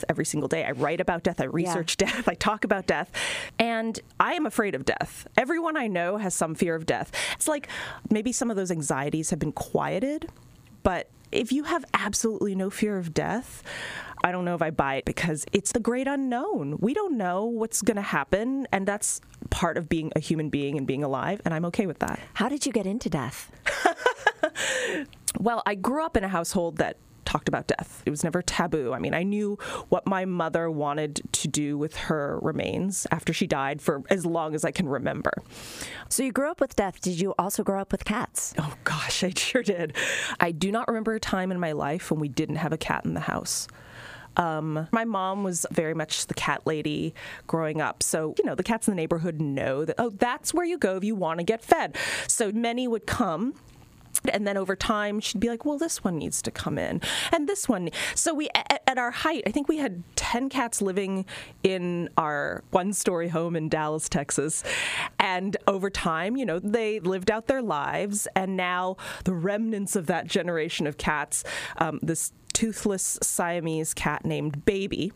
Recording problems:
squashed, flat; heavily

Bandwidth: 15 kHz